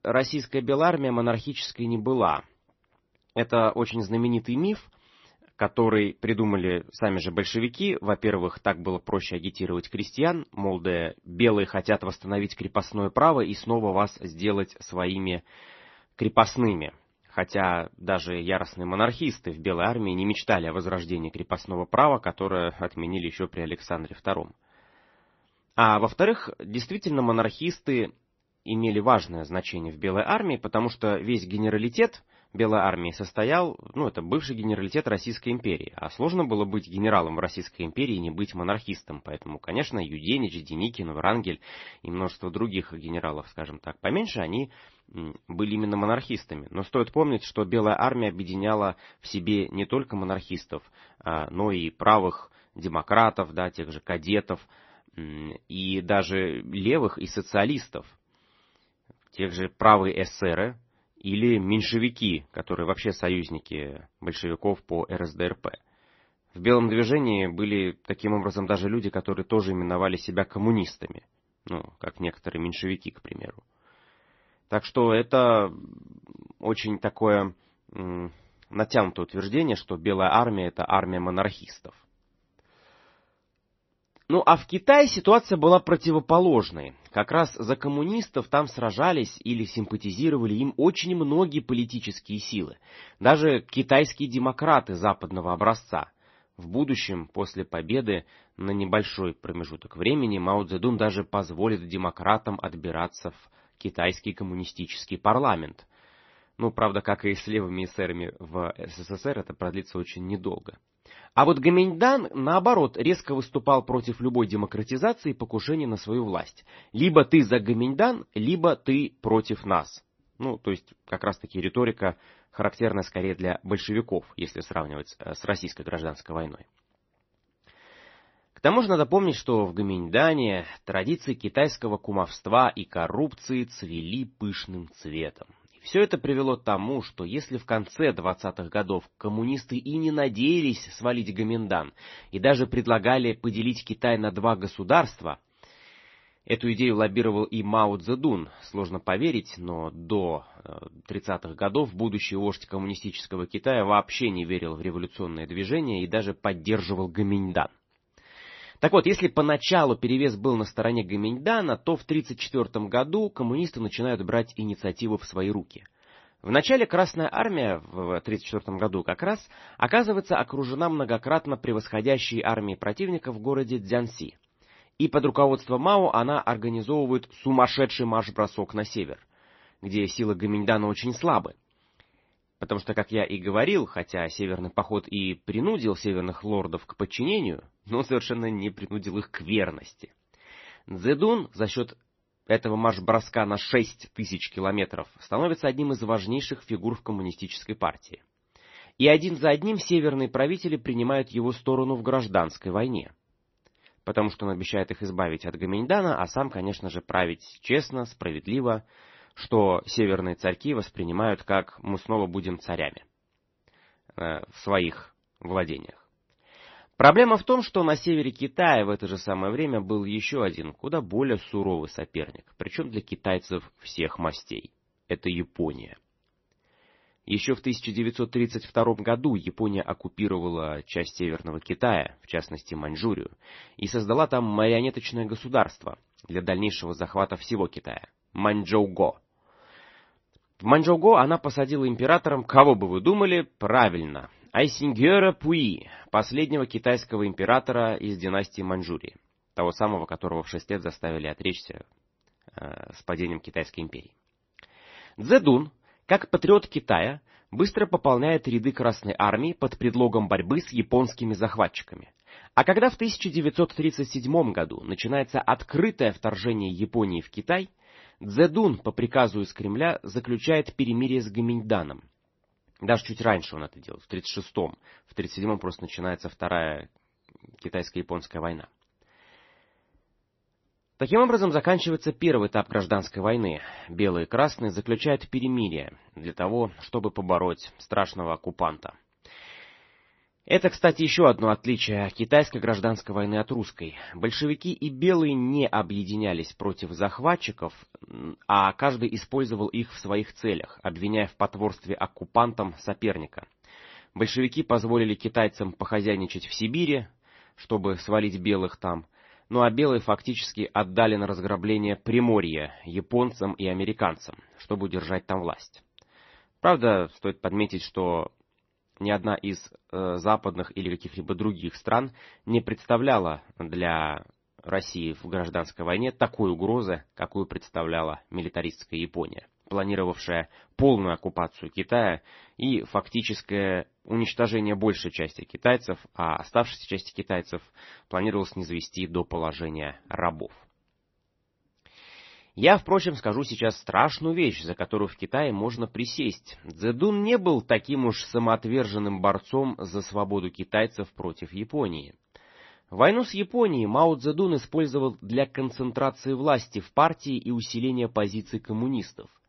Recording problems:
garbled, watery; slightly; nothing above 6 kHz

